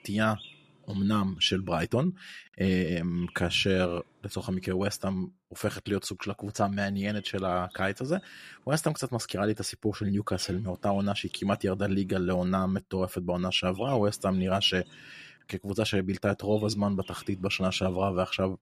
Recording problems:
animal sounds; faint; throughout; 25 dB below the speech

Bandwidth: 14.5 kHz